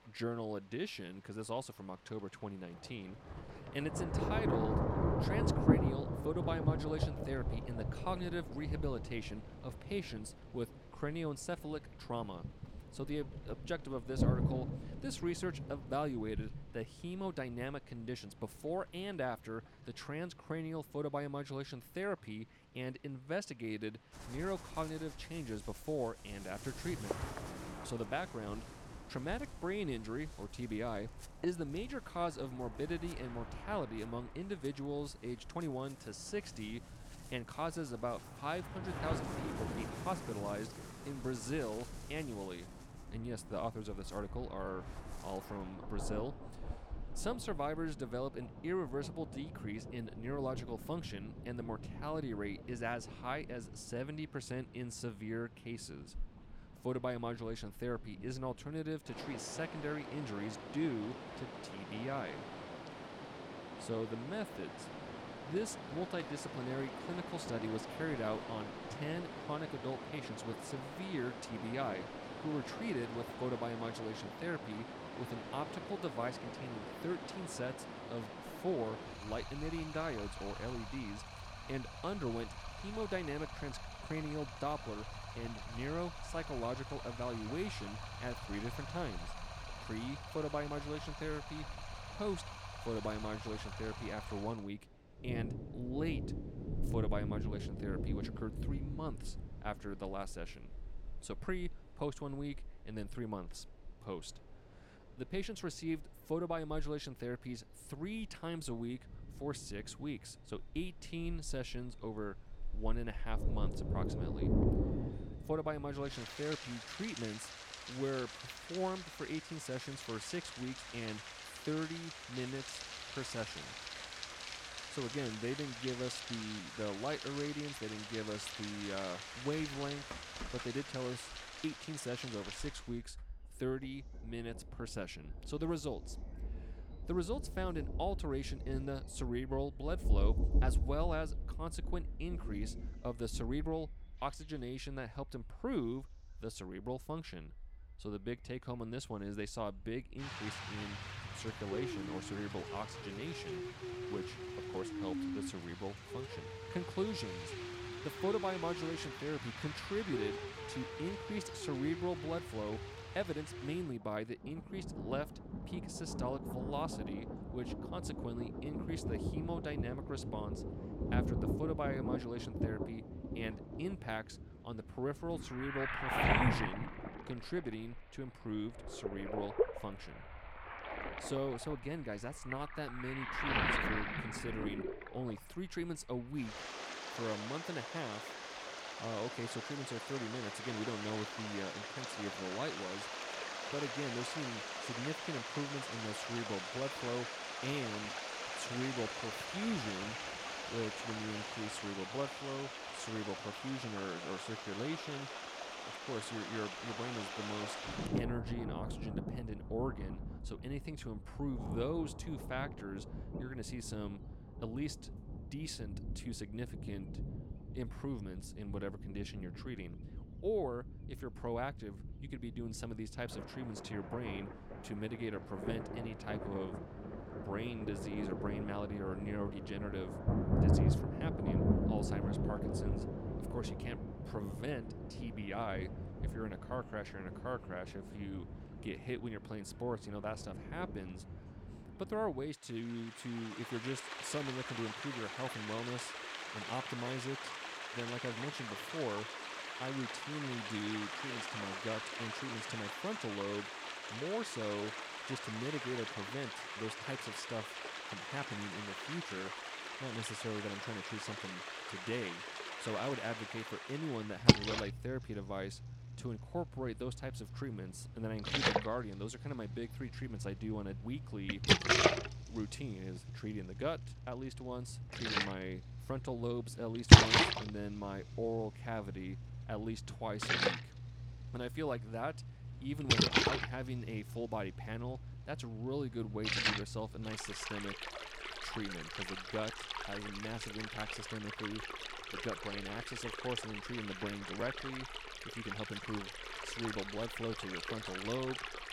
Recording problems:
rain or running water; very loud; throughout; 2 dB above the speech

